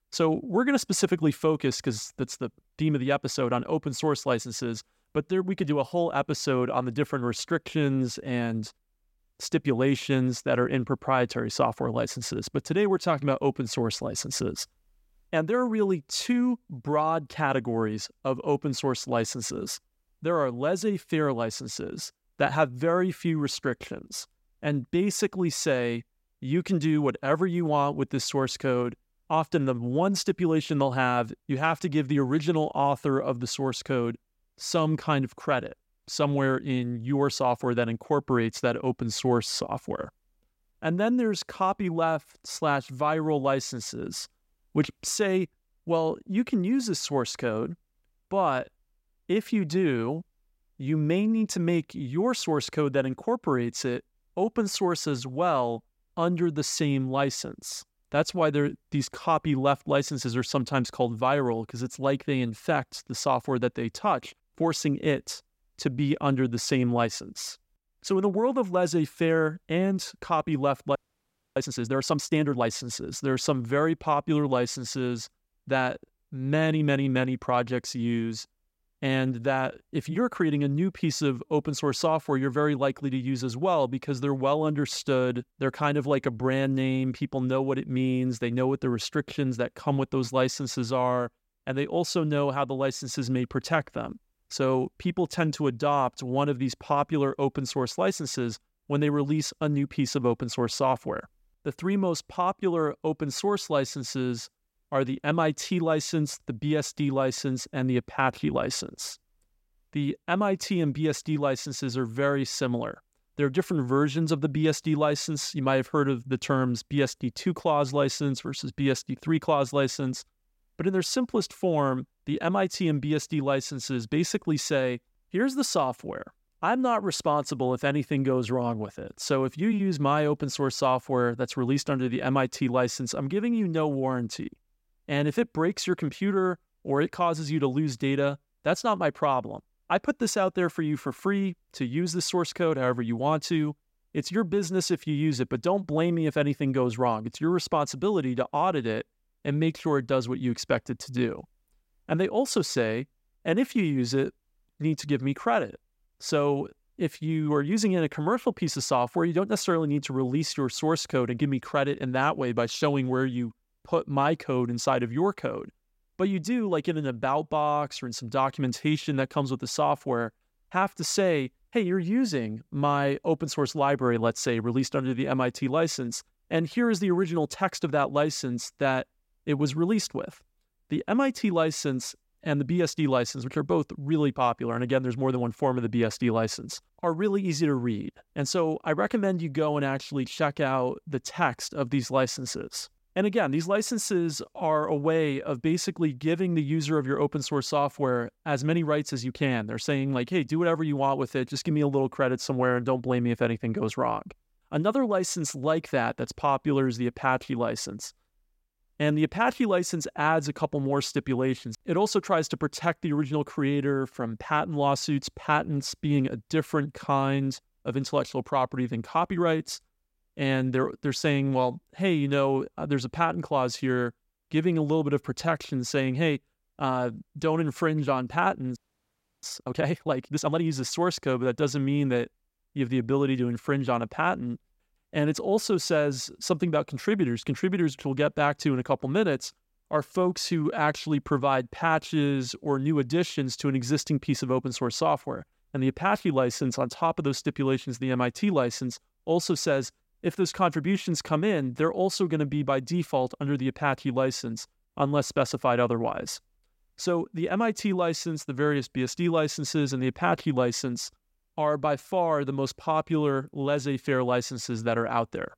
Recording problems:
audio freezing; at 1:11 for 0.5 s and at 3:49 for 0.5 s

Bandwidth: 16 kHz